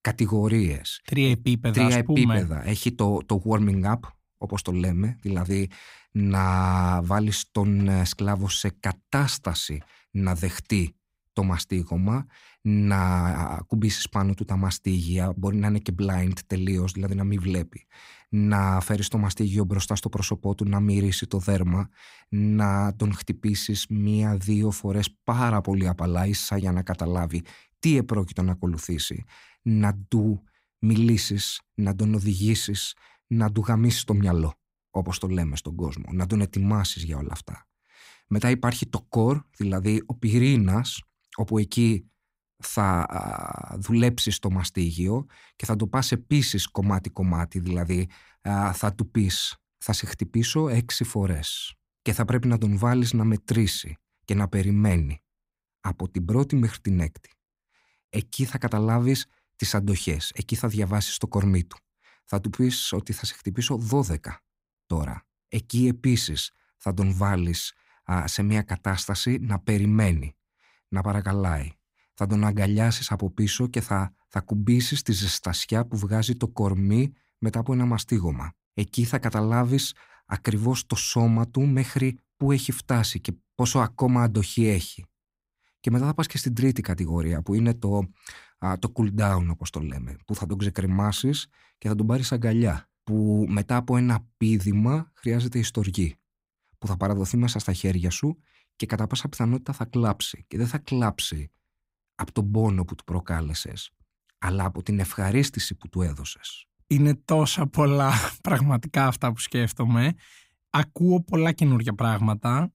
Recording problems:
none

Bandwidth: 15.5 kHz